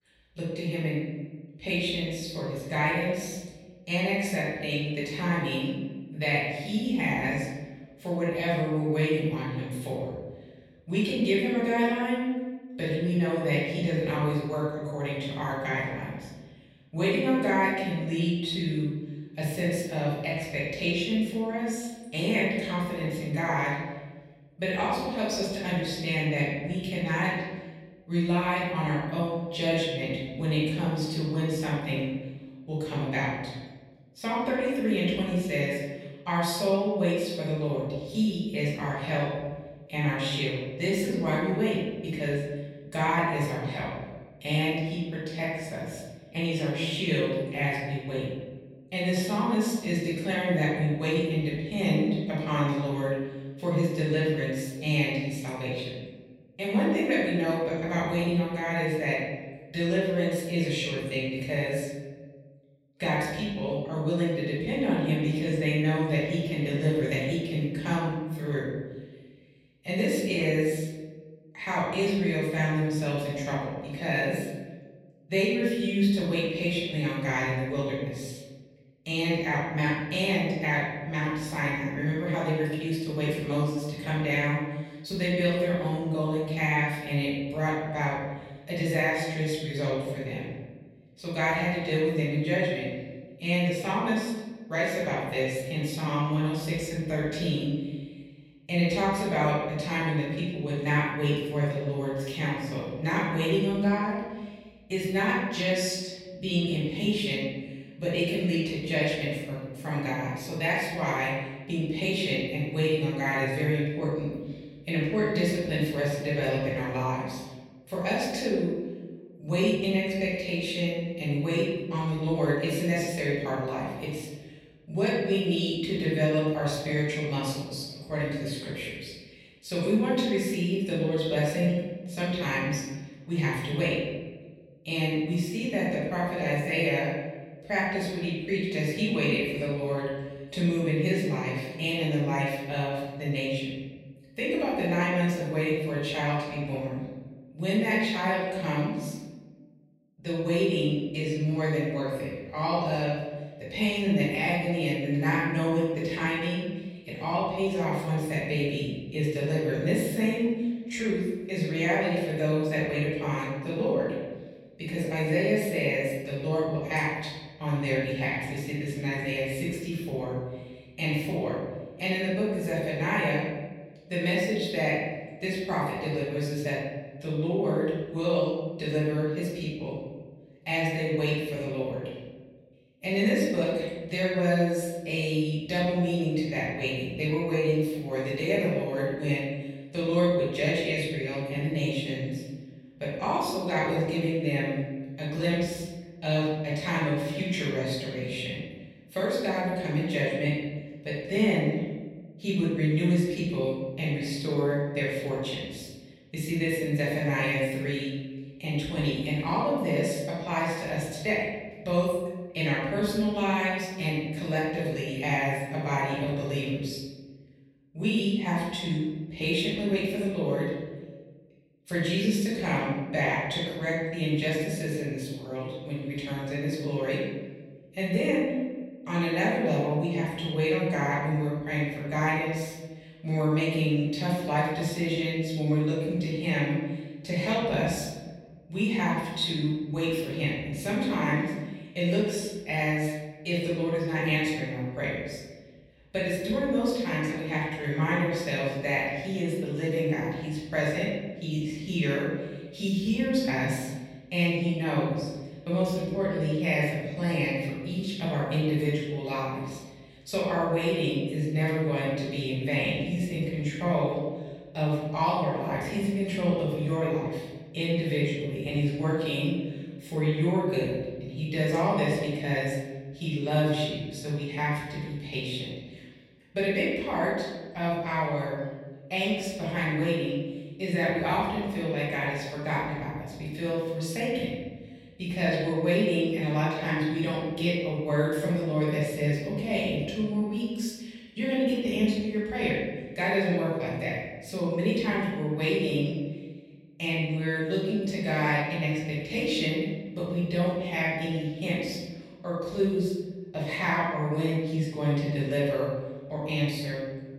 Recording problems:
off-mic speech; far
room echo; noticeable; dies away in 1.3 s

